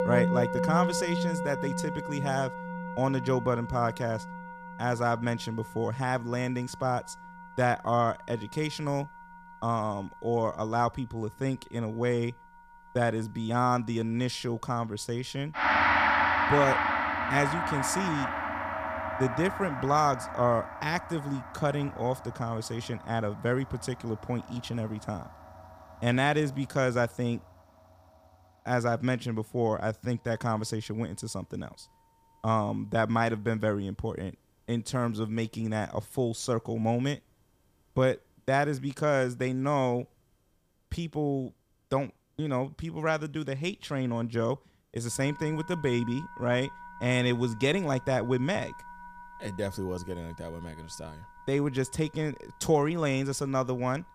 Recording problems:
background music; loud; throughout; 2 dB below the speech

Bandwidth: 15 kHz